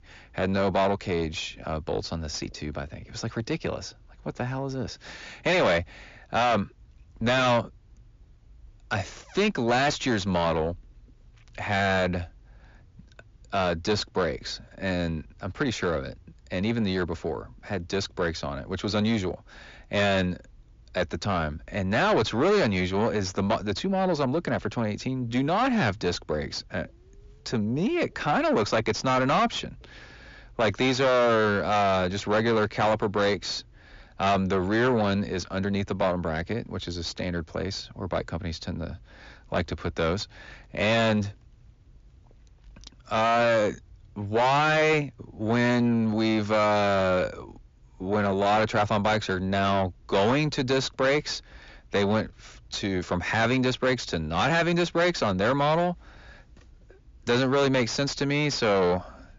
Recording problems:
distortion; heavy; 6 dB below the speech
high frequencies cut off; noticeable; nothing above 7.5 kHz

